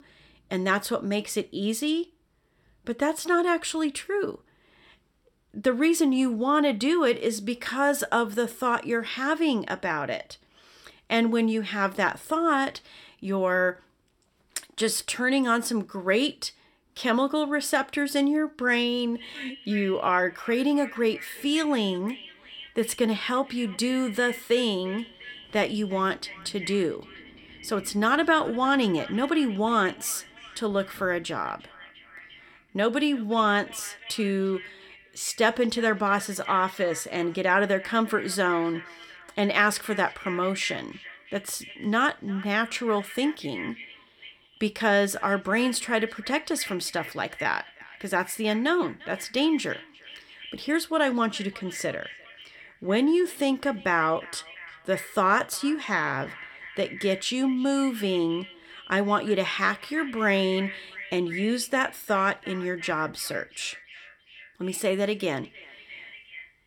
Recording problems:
echo of what is said; noticeable; from 19 s on; 350 ms later, 15 dB below the speech

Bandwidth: 17 kHz